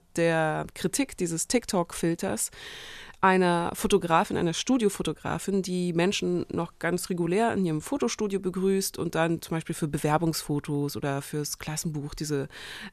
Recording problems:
none

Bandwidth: 13.5 kHz